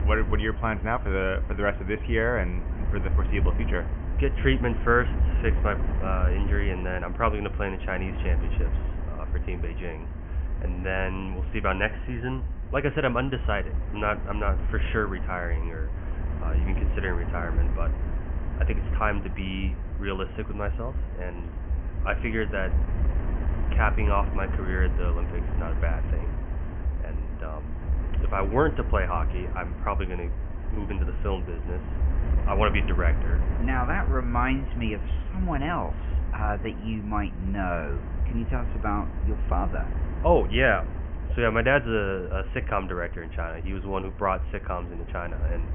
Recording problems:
high frequencies cut off; severe; nothing above 3 kHz
wind noise on the microphone; occasional gusts; 15 dB below the speech

